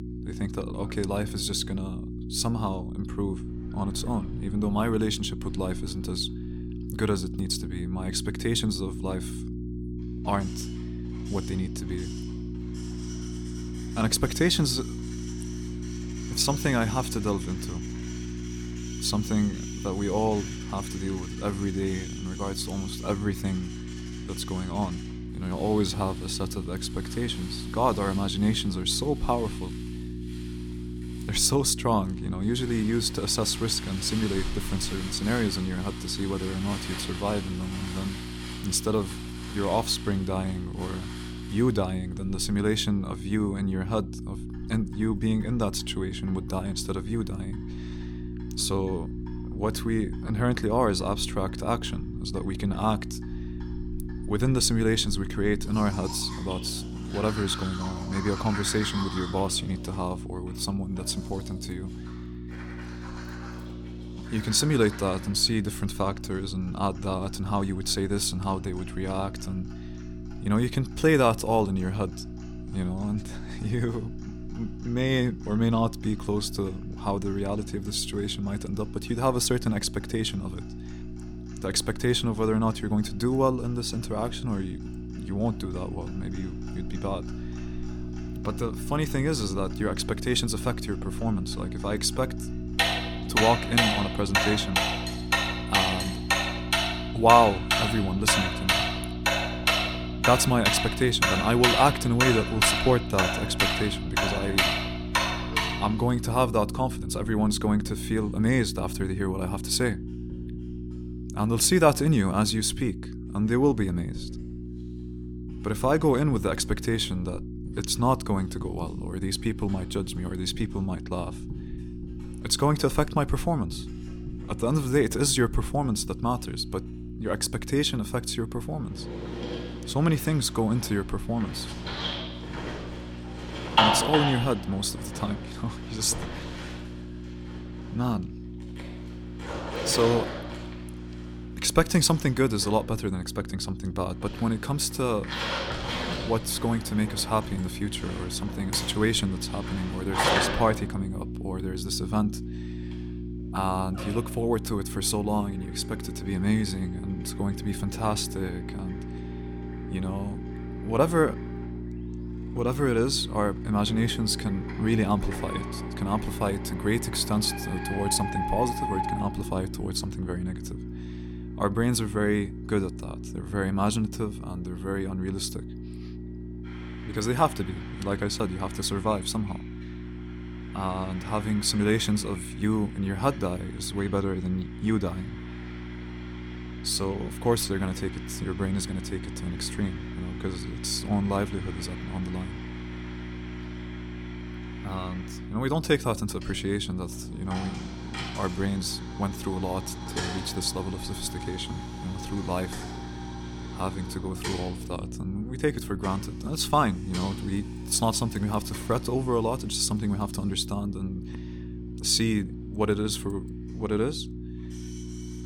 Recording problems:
household noises; loud; throughout; 5 dB below the speech
electrical hum; noticeable; throughout; 60 Hz, 15 dB below the speech

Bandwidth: 18 kHz